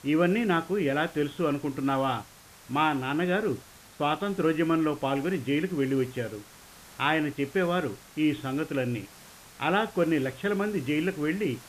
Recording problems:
high frequencies cut off; severe; nothing above 4 kHz
hiss; faint; throughout; 20 dB below the speech

